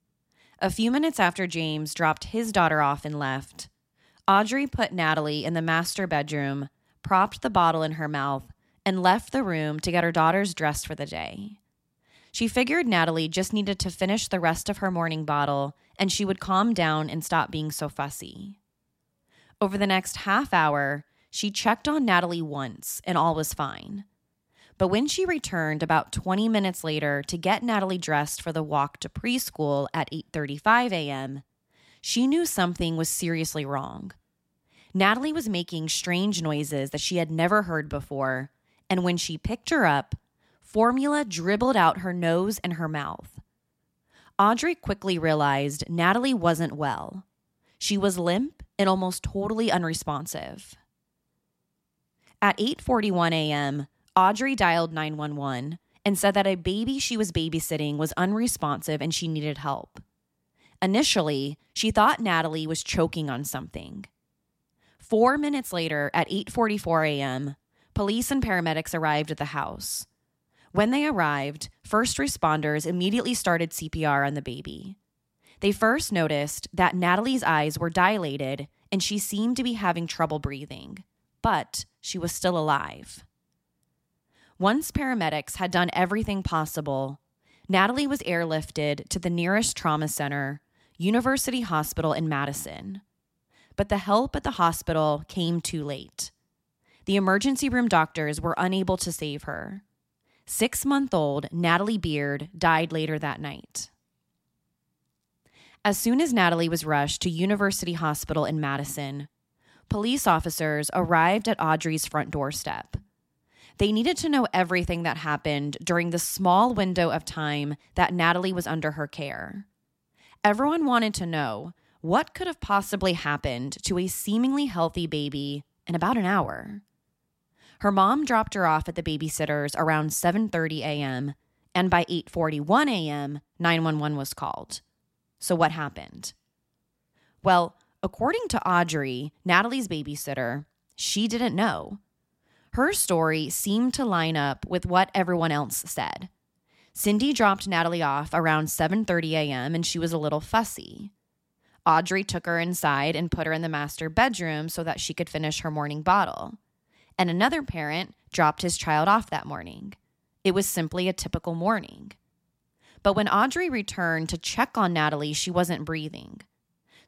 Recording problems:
none

